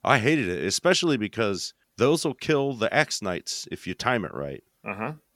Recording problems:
none

